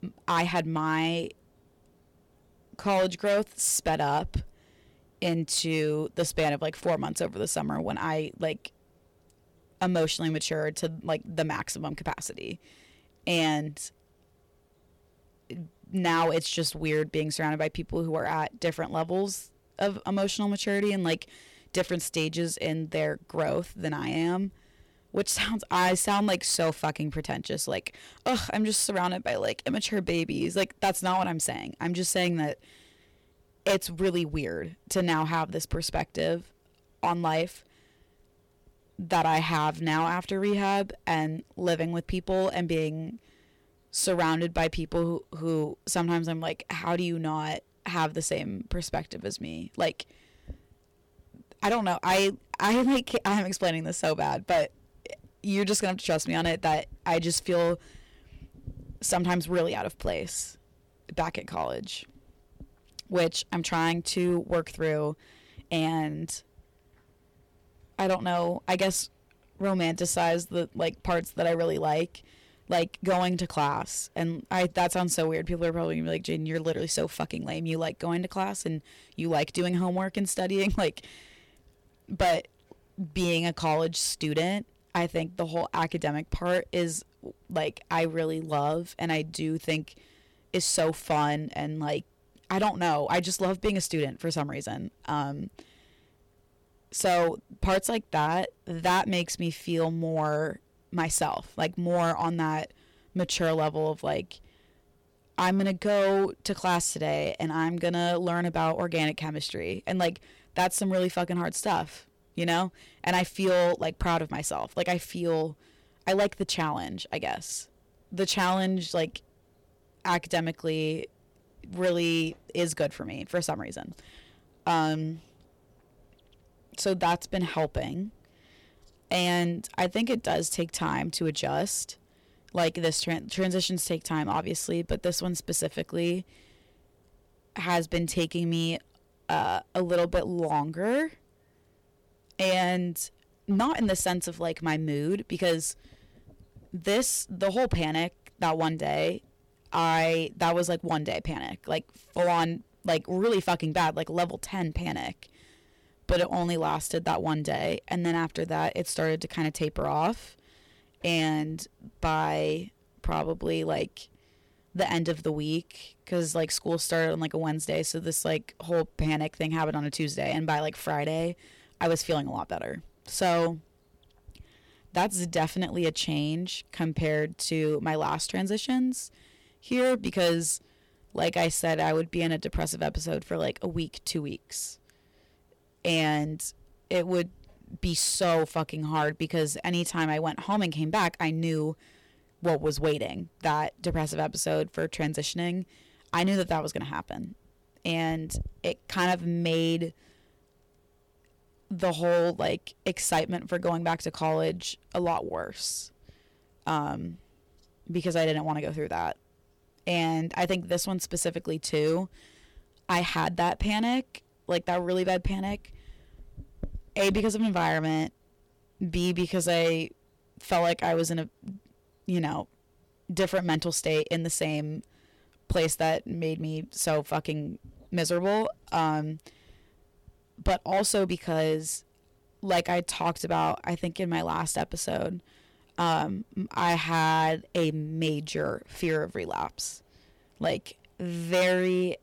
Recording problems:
distortion; slight; 5% of the sound clipped

